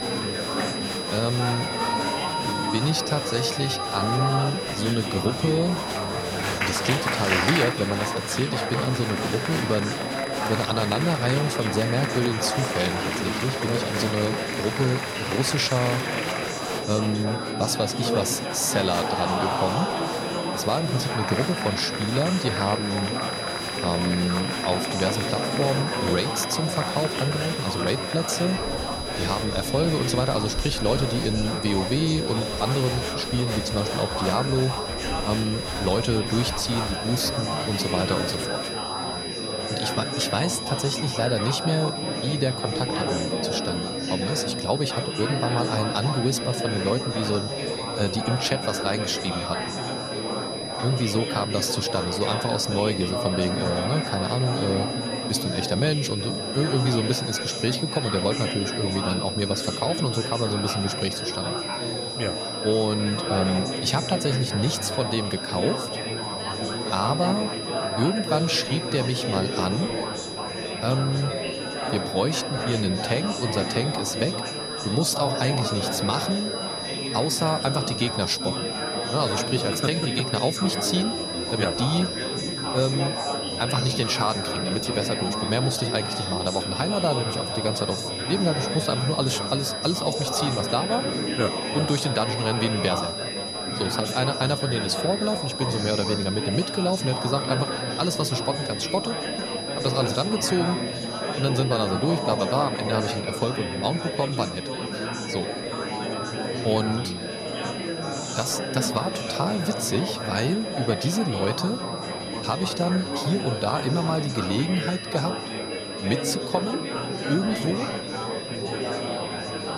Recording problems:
high-pitched whine; loud; throughout; 5 kHz, 6 dB below the speech
murmuring crowd; loud; throughout; 3 dB below the speech

